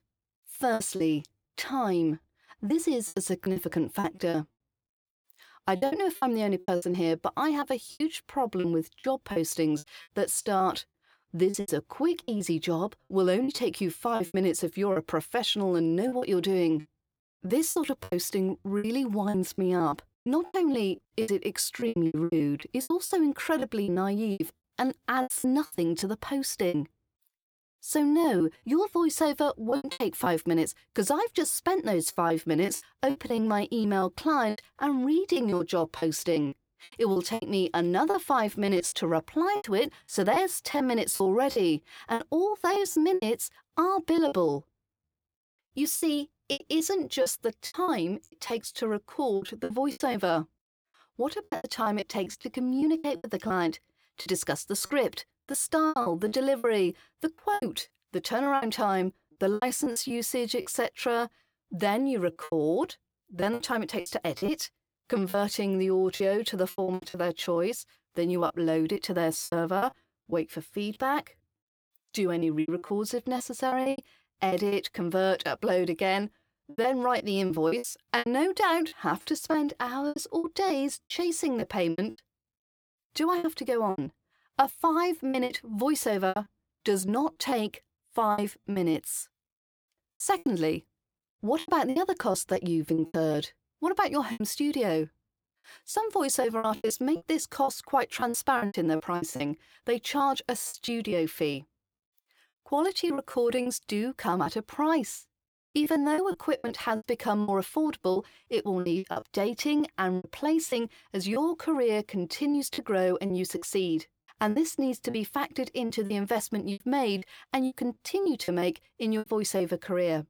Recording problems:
choppy; very; 13% of the speech affected

